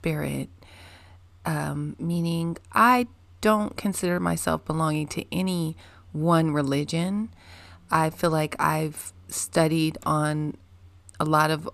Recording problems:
none

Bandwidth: 14.5 kHz